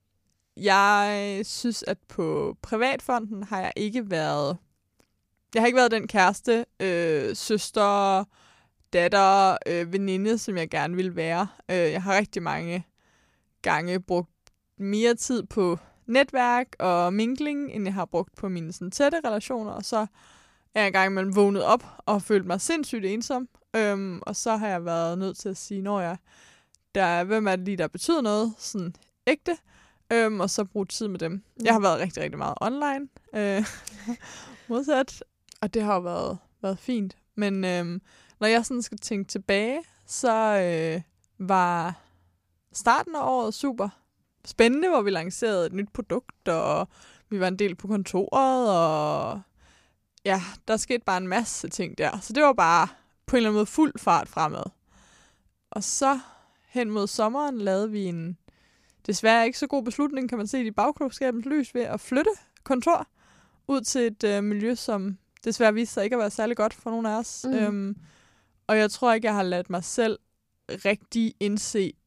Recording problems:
none

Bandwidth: 15 kHz